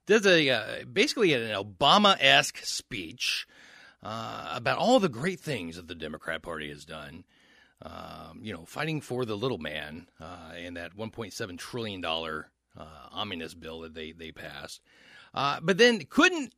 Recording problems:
none

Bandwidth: 14.5 kHz